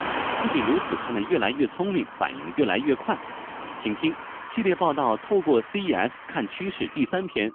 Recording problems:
phone-call audio; poor line; nothing above 3 kHz
traffic noise; loud; throughout; 9 dB below the speech

